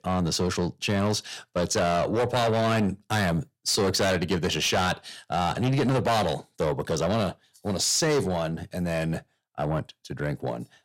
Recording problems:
distortion; heavy; 7 dB below the speech

